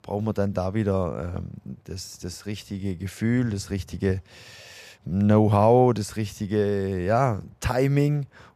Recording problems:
none

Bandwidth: 14.5 kHz